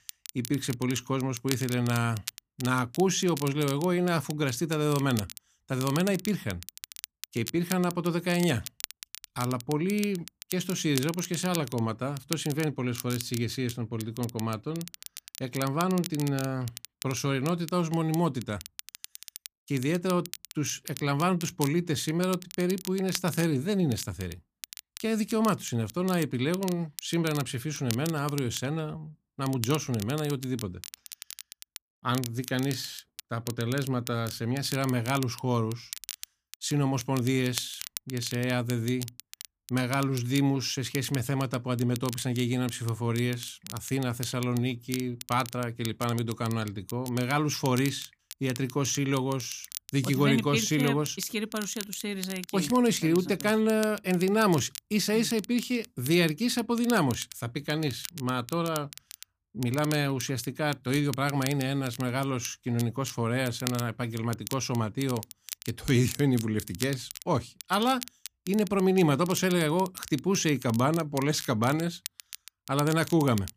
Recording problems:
crackle, like an old record; noticeable; 15 dB below the speech

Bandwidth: 15 kHz